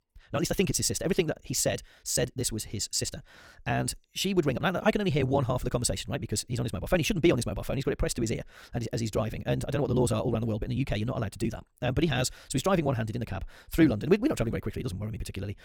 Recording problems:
wrong speed, natural pitch; too fast; 1.6 times normal speed

